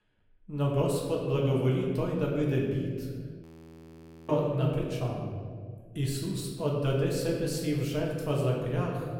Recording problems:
off-mic speech; far
room echo; noticeable; dies away in 1.6 s
audio freezing; at 3.5 s for 1 s

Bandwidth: 16.5 kHz